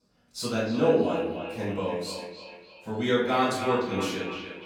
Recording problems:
echo of what is said; strong; throughout; 300 ms later, 8 dB below the speech
off-mic speech; far
room echo; noticeable; dies away in 0.6 s

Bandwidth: 17 kHz